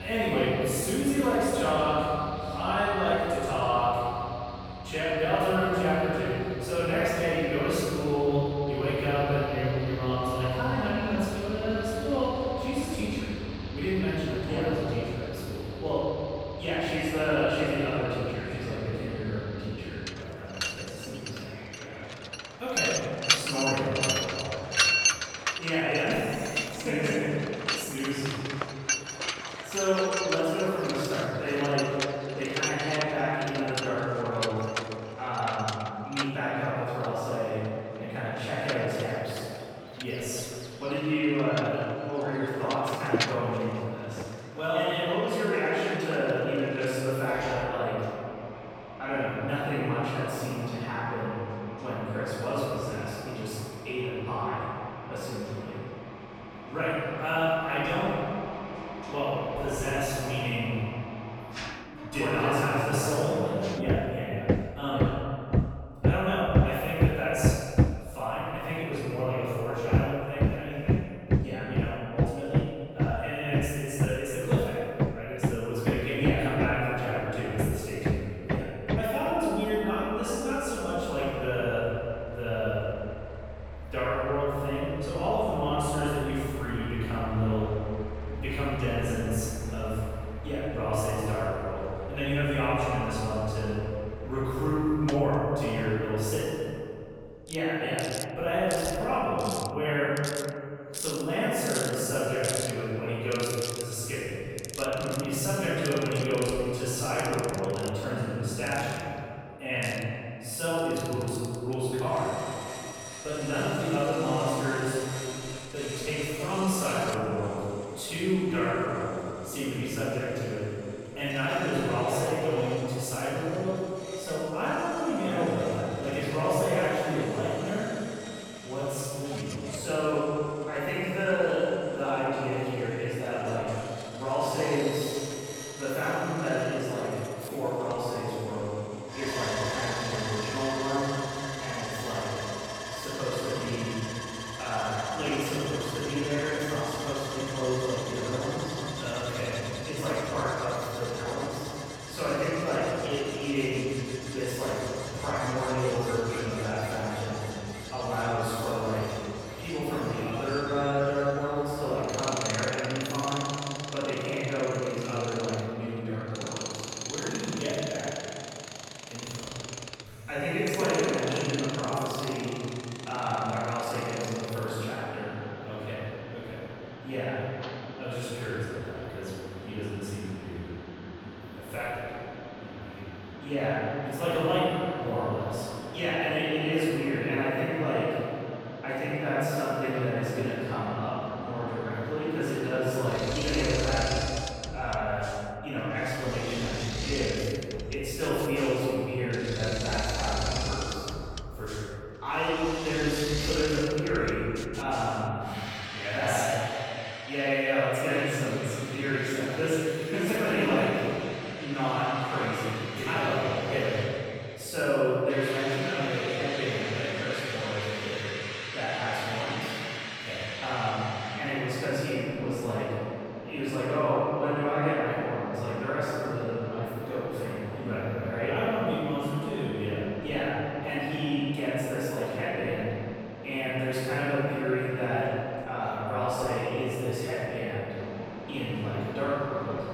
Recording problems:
room echo; strong; dies away in 2.5 s
off-mic speech; far
machinery noise; loud; throughout; 6 dB below the speech
abrupt cut into speech; at the start

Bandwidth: 18 kHz